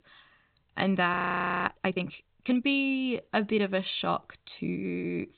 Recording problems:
high frequencies cut off; severe; nothing above 4 kHz
audio freezing; at 1 s for 0.5 s

